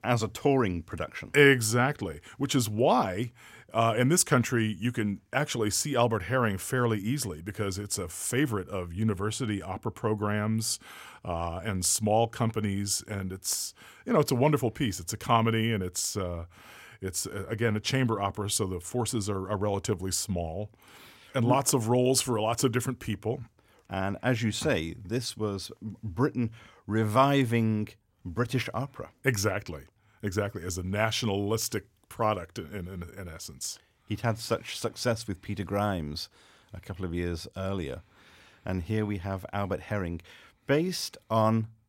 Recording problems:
none

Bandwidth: 16 kHz